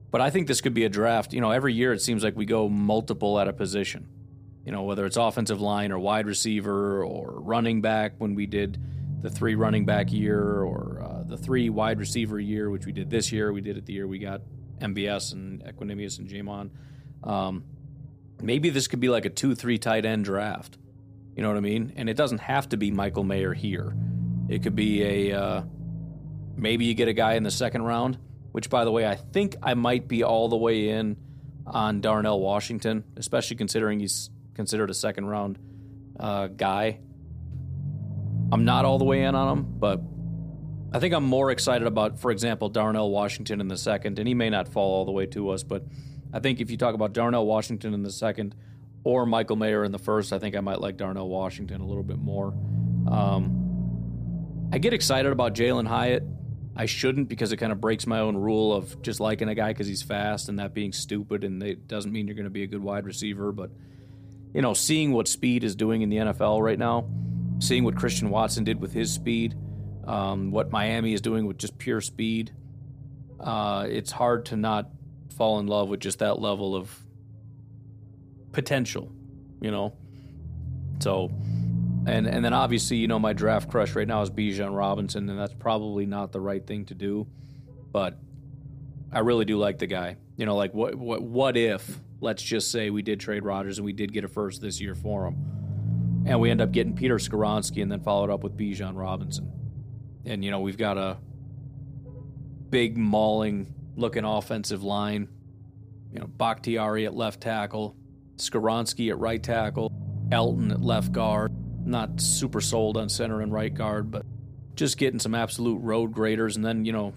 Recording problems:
low rumble; noticeable; throughout; 20 dB below the speech

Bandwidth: 15 kHz